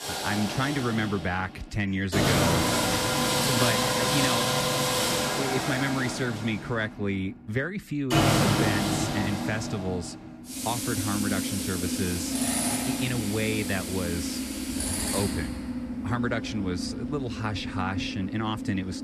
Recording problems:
machinery noise; very loud; throughout; 3 dB above the speech

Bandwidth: 14 kHz